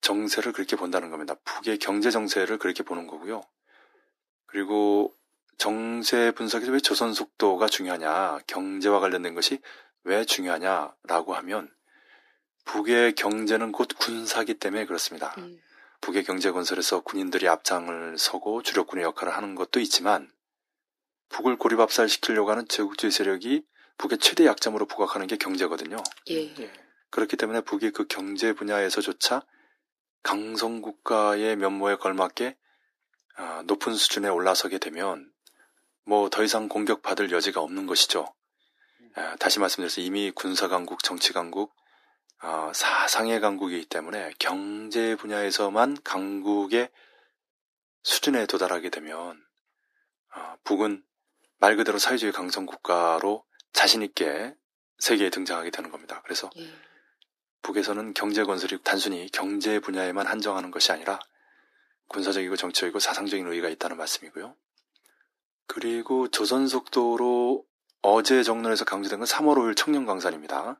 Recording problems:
thin; very; fading below 300 Hz

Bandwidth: 14.5 kHz